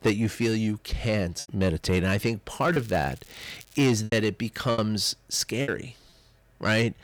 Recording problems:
distortion; slight; 10 dB below the speech
crackling; faint; from 2.5 to 4 s; 25 dB below the speech
choppy; occasionally; 5% of the speech affected

